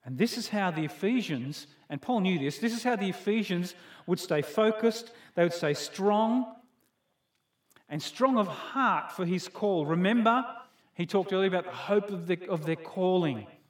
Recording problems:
echo of what is said; noticeable; throughout; 110 ms later, 15 dB below the speech

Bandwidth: 17 kHz